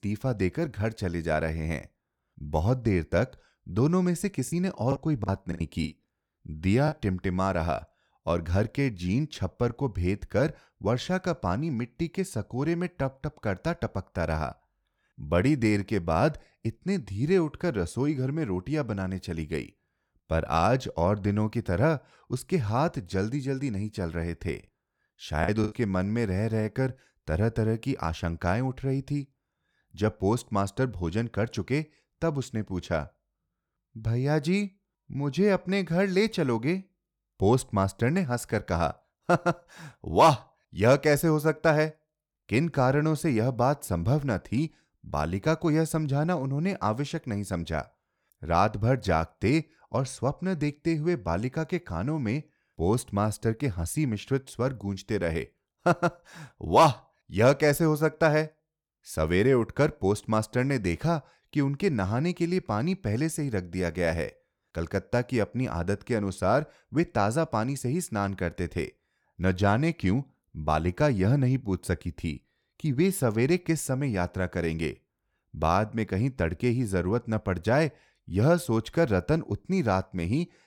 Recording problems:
choppy; very; from 4.5 to 7 s and at 25 s; 16% of the speech affected

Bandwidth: 18.5 kHz